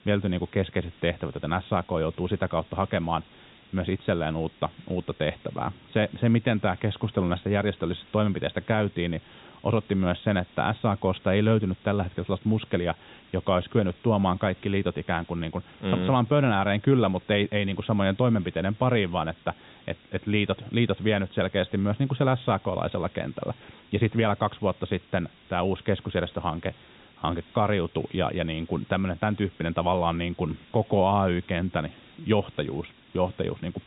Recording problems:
high frequencies cut off; severe; nothing above 4 kHz
hiss; faint; throughout; 25 dB below the speech

